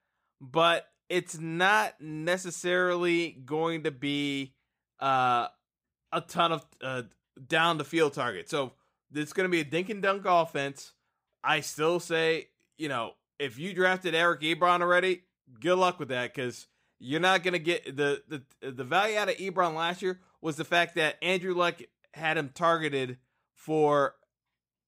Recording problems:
none

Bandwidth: 15.5 kHz